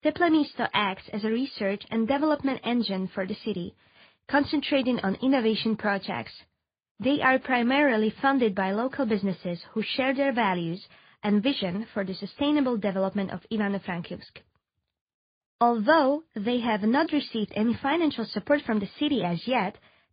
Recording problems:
high frequencies cut off; severe; nothing above 5 kHz
garbled, watery; slightly

